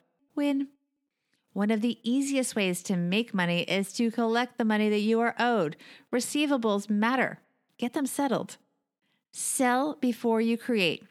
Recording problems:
none

